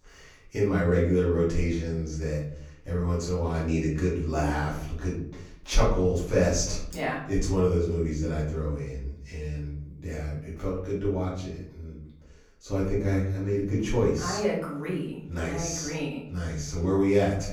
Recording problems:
off-mic speech; far
room echo; noticeable; dies away in 0.6 s

